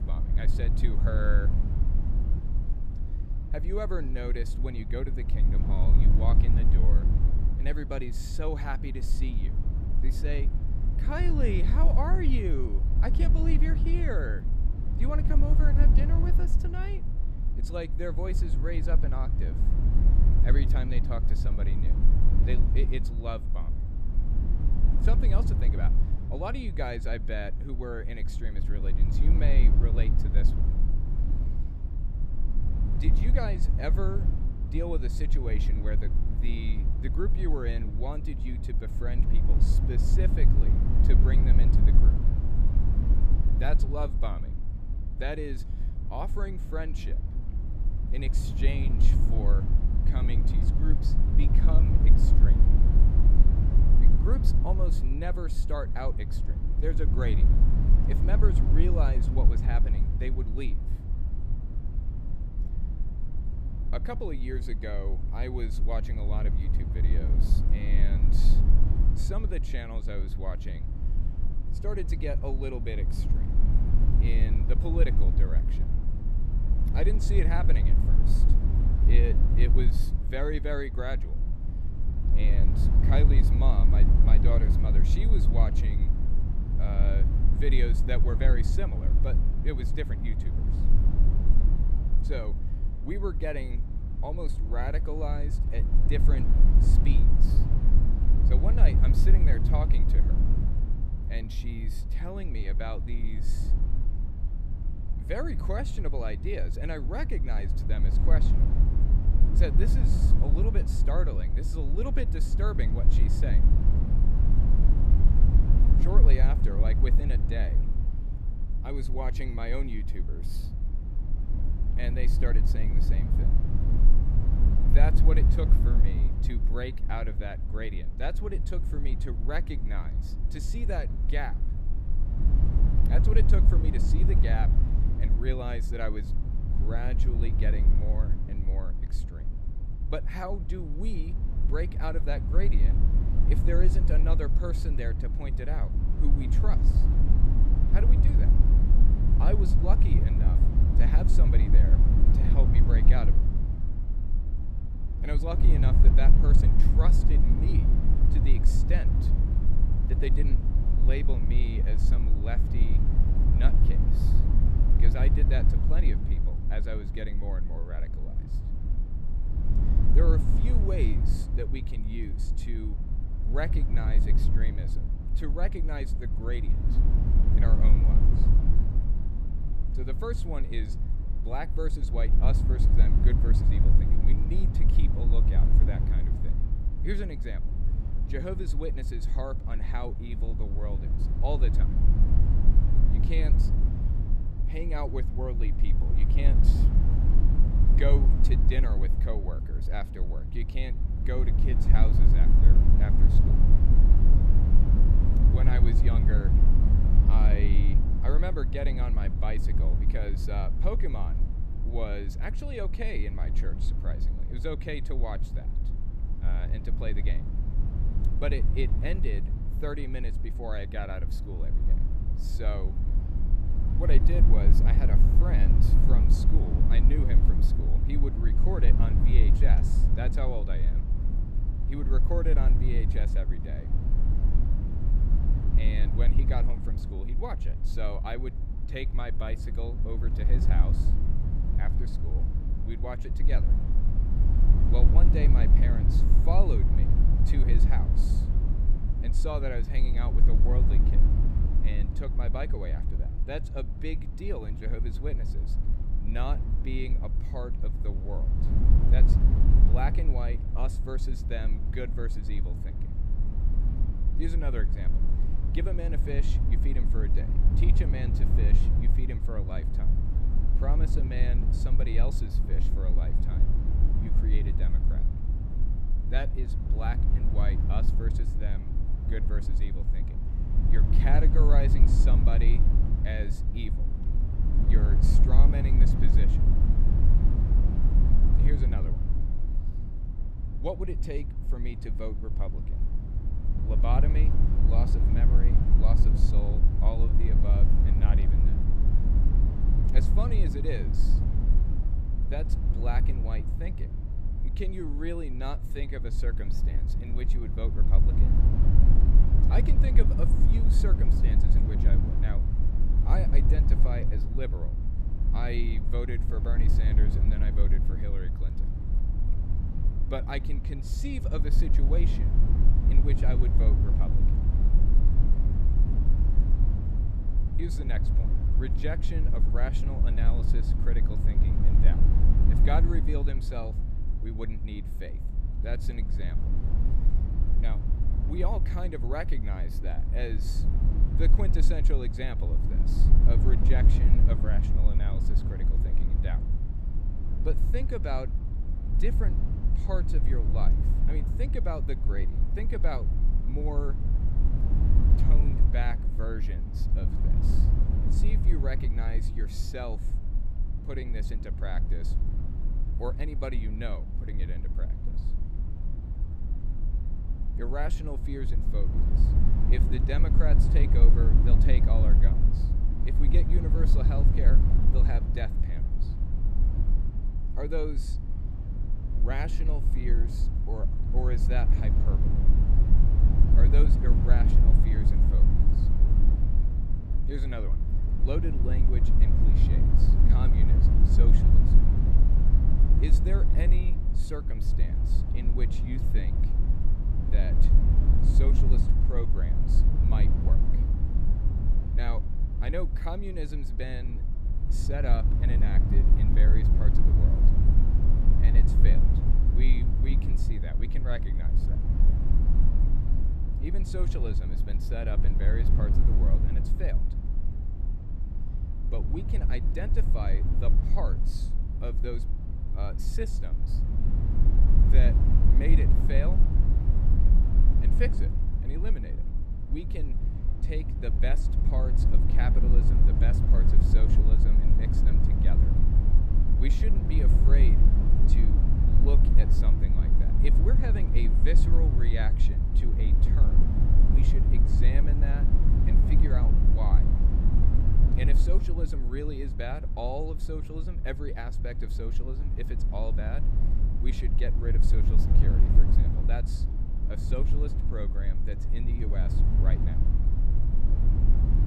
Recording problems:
low rumble; loud; throughout; 4 dB below the speech

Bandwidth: 14.5 kHz